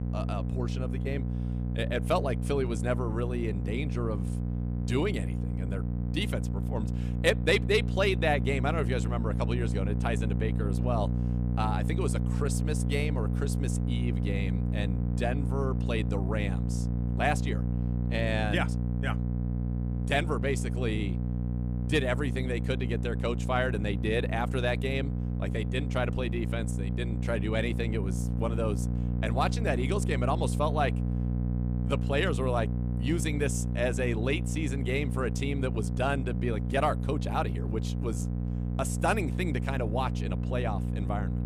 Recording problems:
electrical hum; loud; throughout; 60 Hz, 9 dB below the speech

